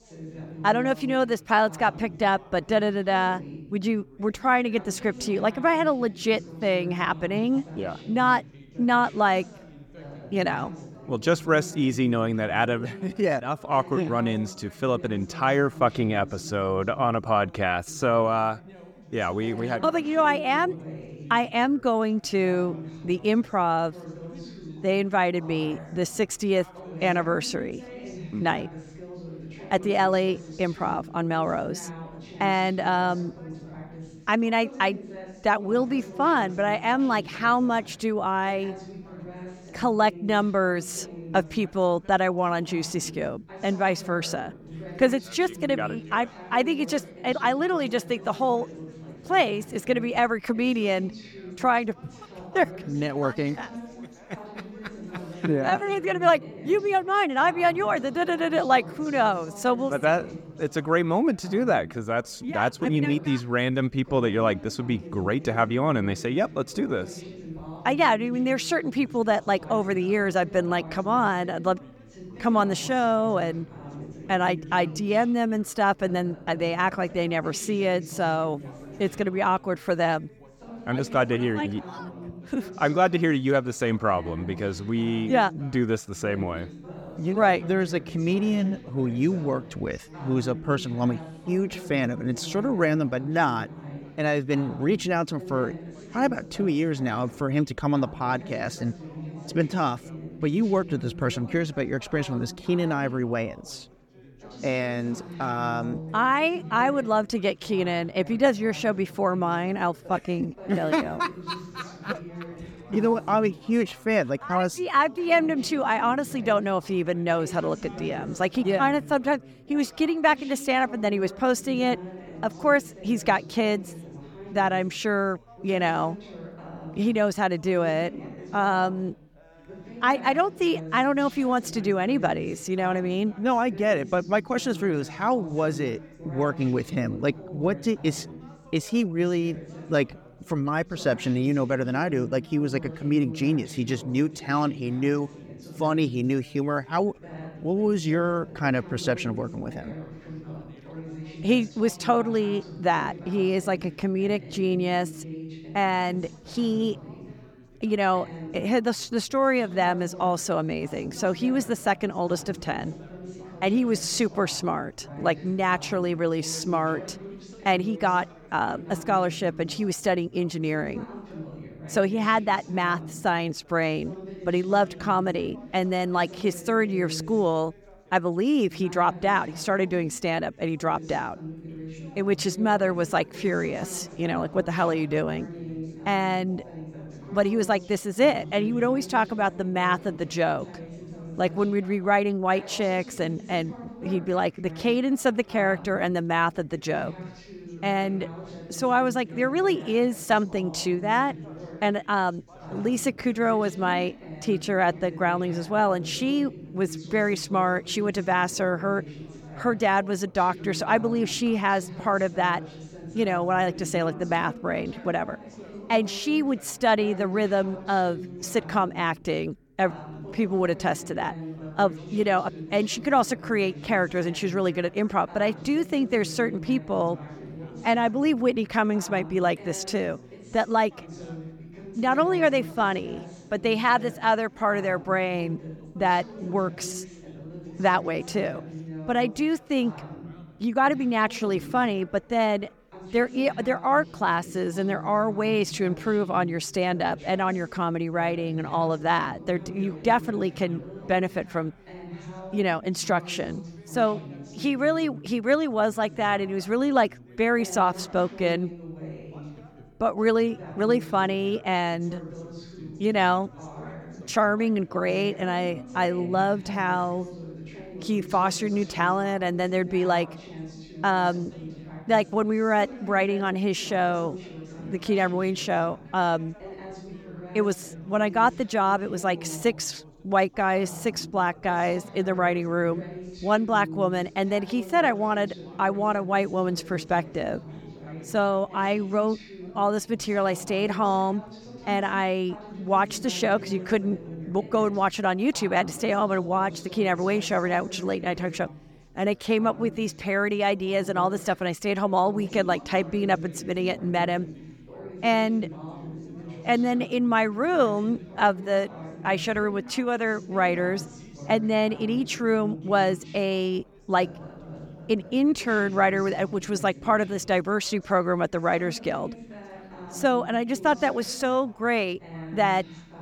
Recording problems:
background chatter; noticeable; throughout; 3 voices, 15 dB below the speech

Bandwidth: 17.5 kHz